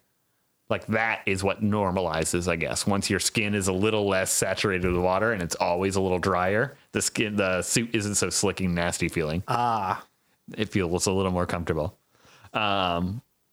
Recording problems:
squashed, flat; somewhat

